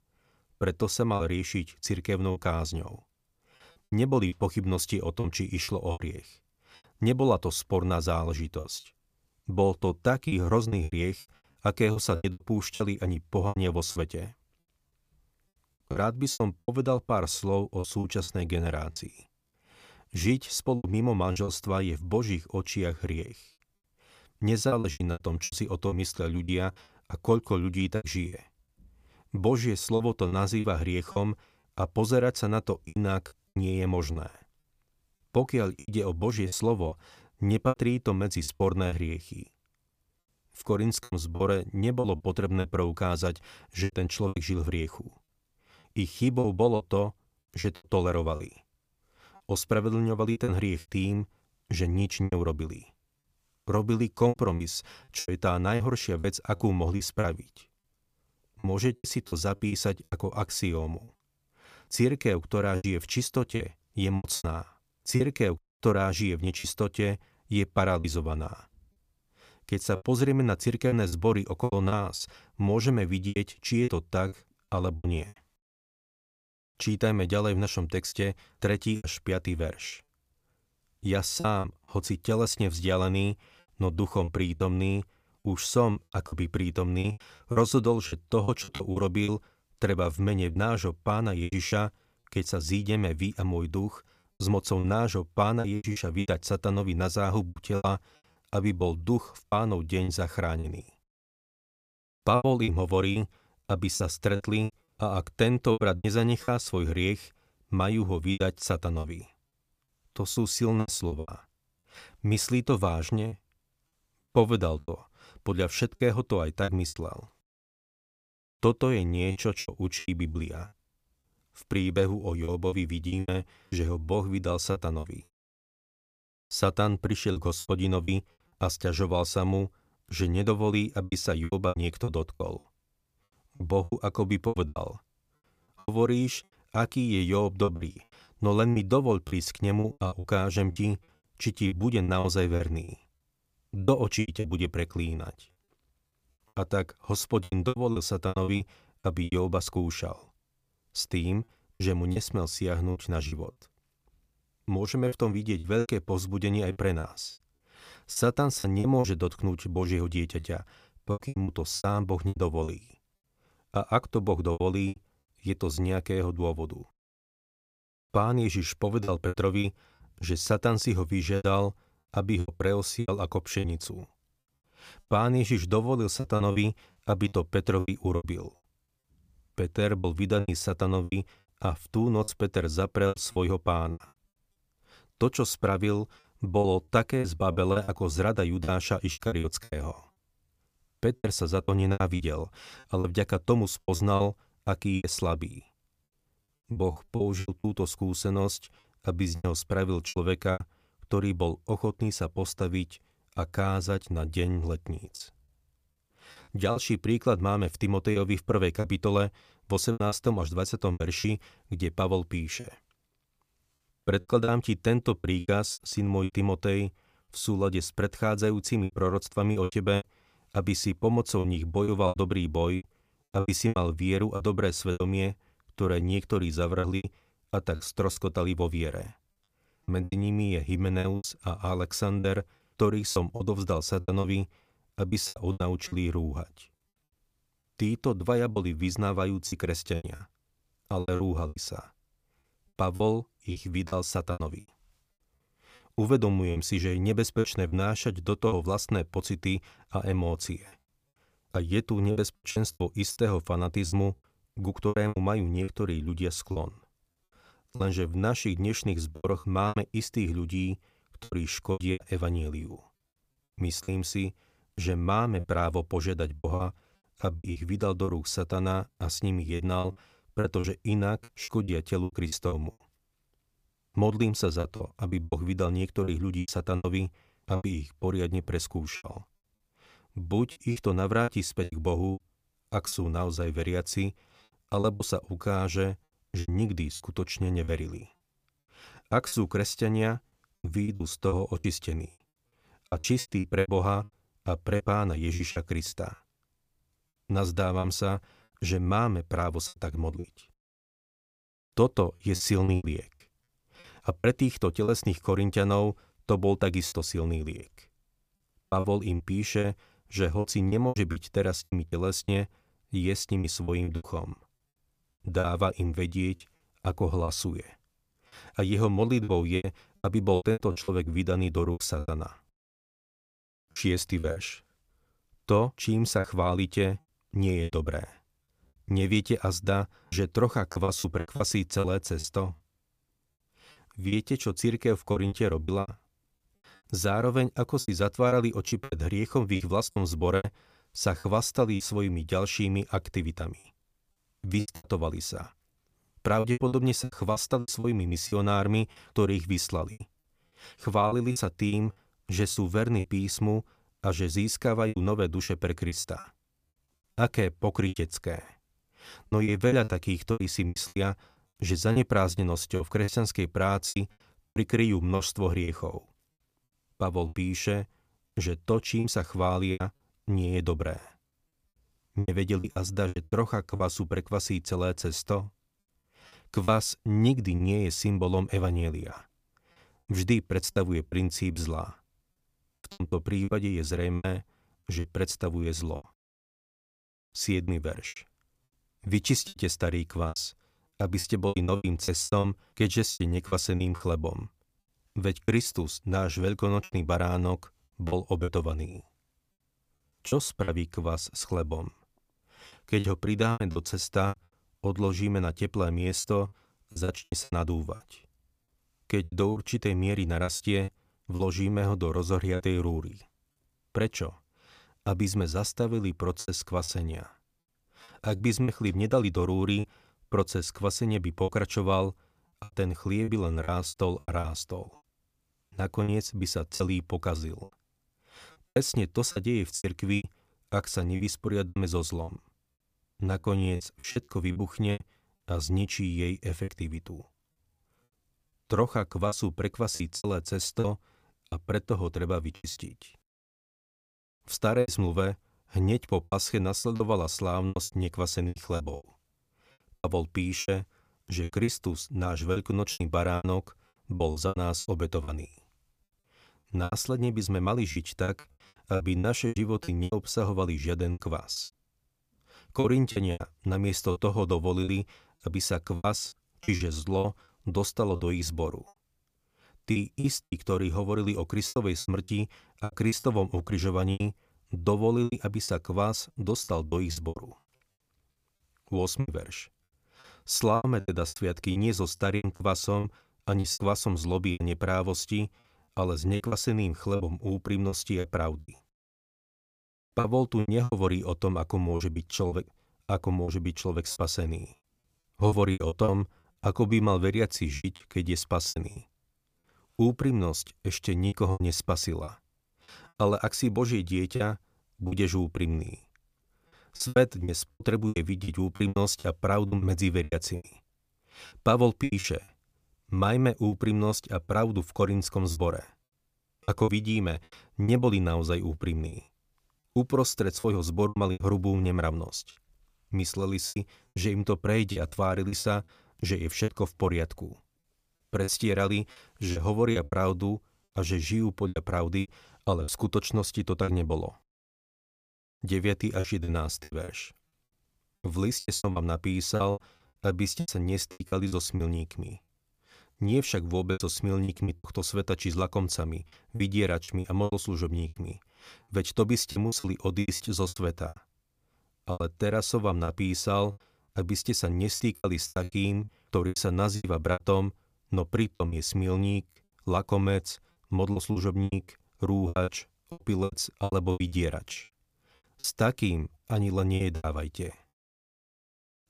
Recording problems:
choppy; very; 10% of the speech affected

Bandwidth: 15 kHz